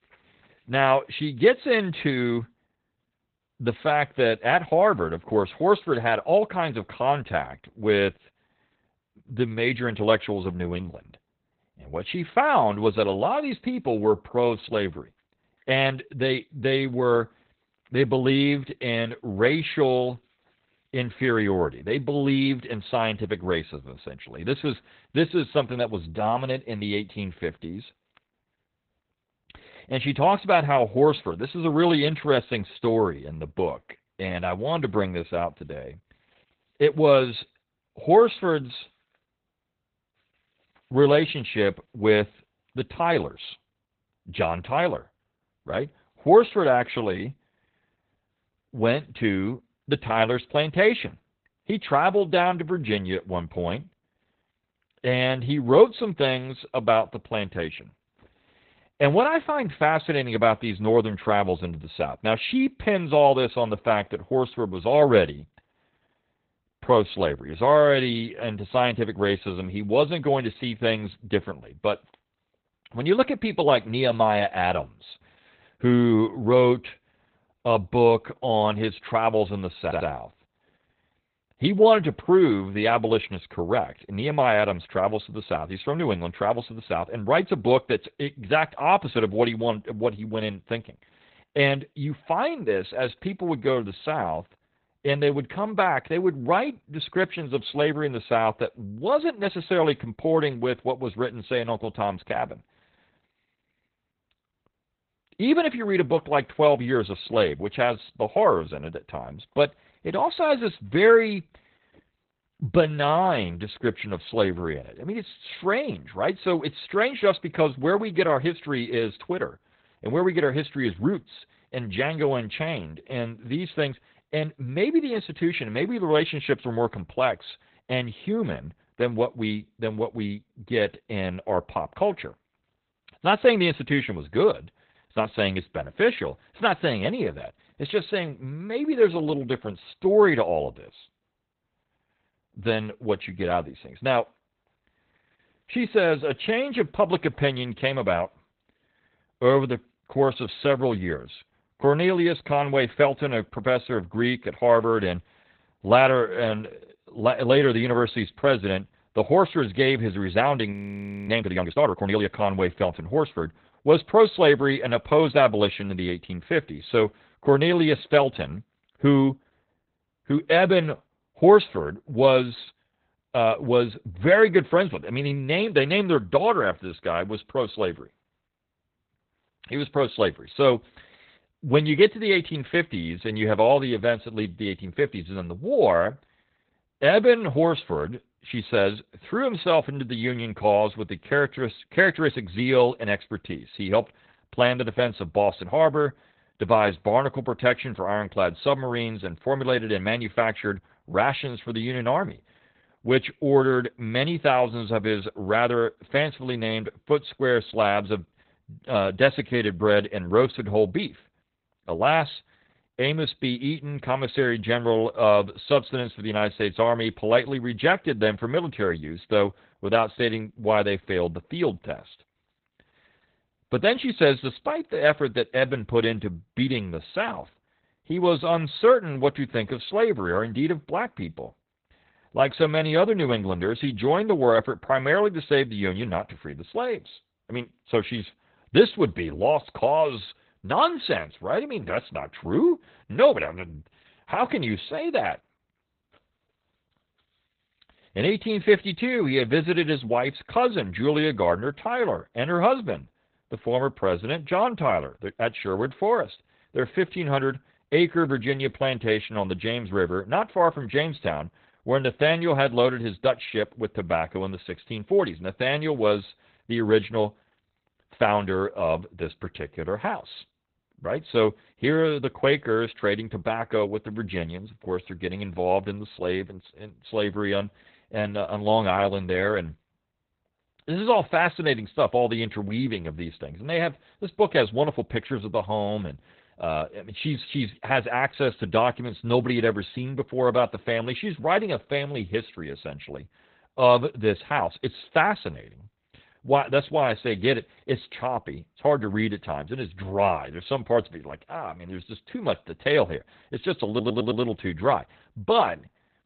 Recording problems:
garbled, watery; badly; nothing above 4 kHz
audio stuttering; at 1:20 and at 5:04
audio freezing; at 2:41 for 0.5 s

